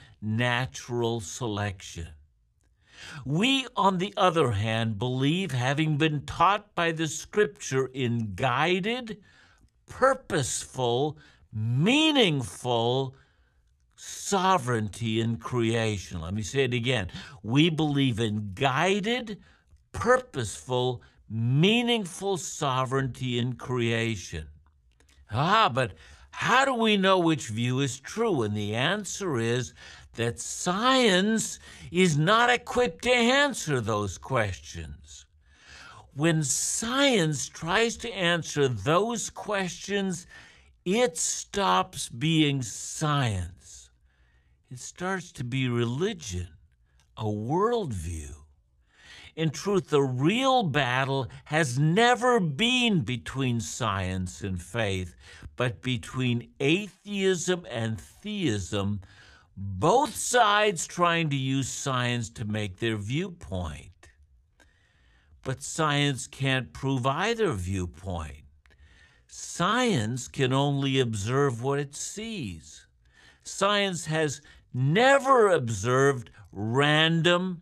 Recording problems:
wrong speed, natural pitch; too slow; 0.6 times normal speed

